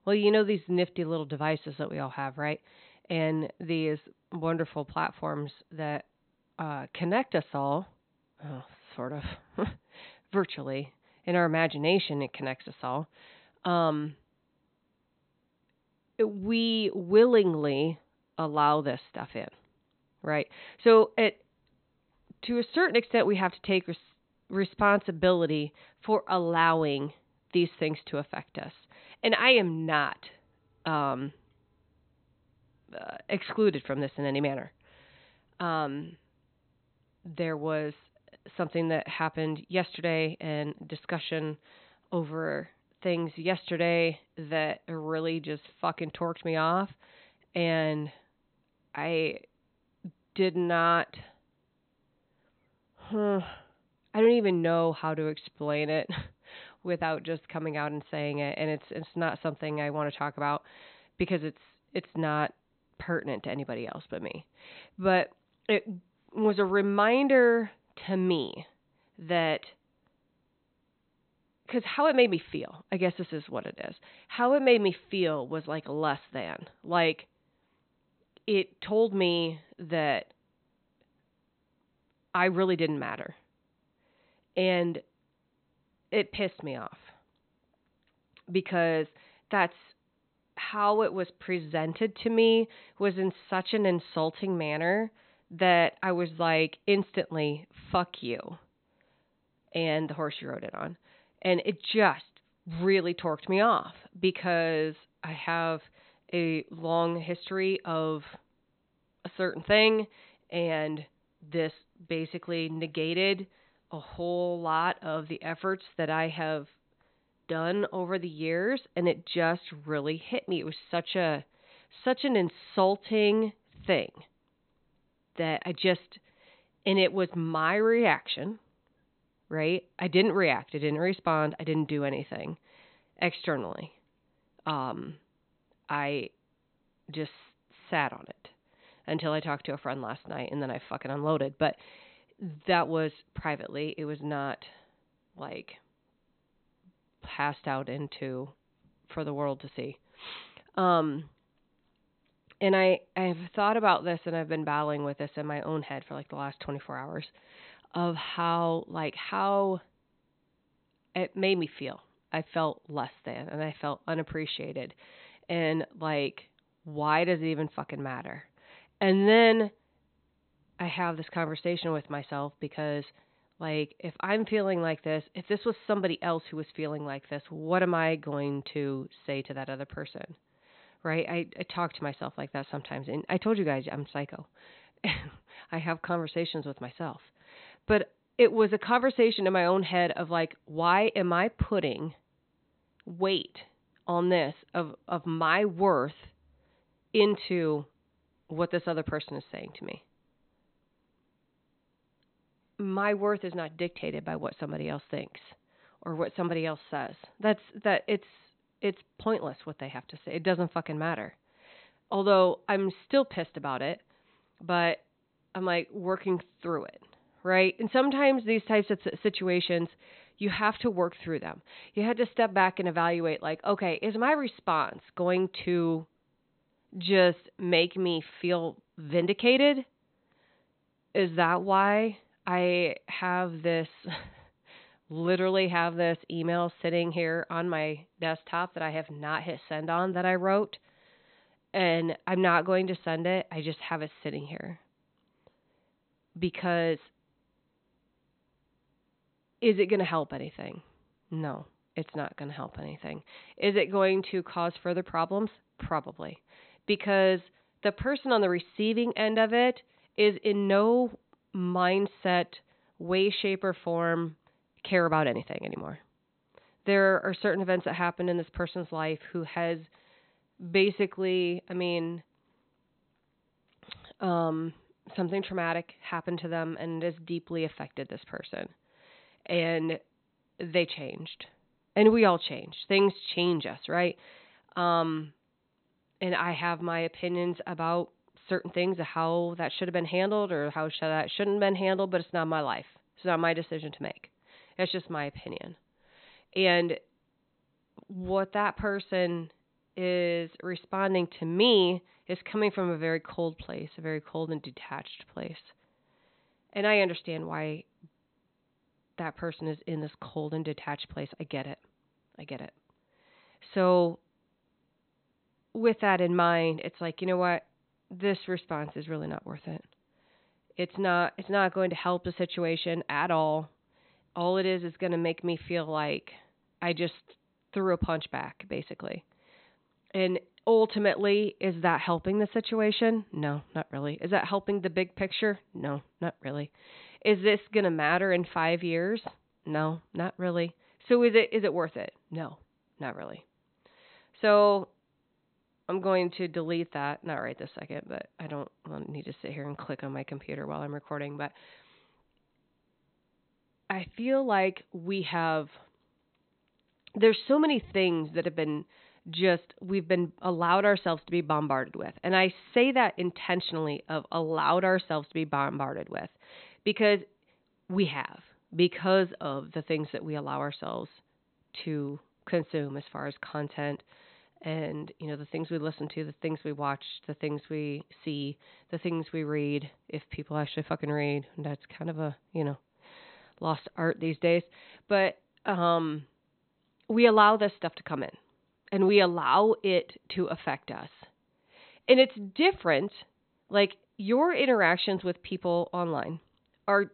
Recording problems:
high frequencies cut off; severe; nothing above 4 kHz

